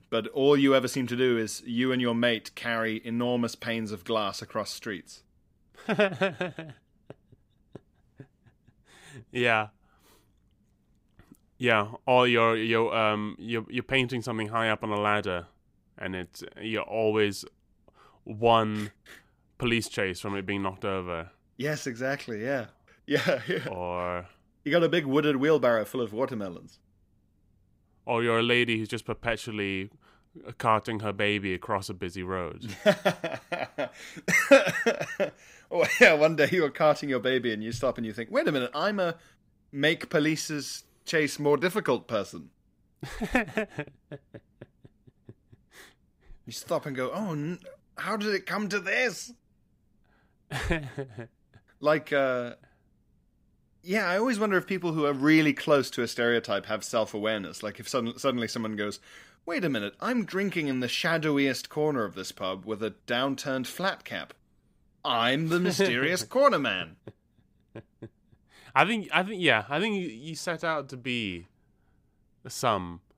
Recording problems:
none

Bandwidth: 15.5 kHz